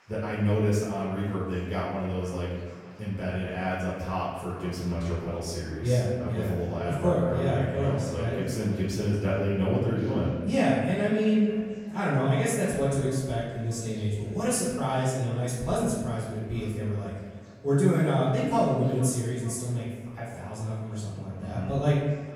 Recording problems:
off-mic speech; far
room echo; noticeable; dies away in 1.2 s
echo of what is said; faint; throughout; 450 ms later, 25 dB below the speech
chatter from many people; faint; throughout; 25 dB below the speech

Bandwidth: 16.5 kHz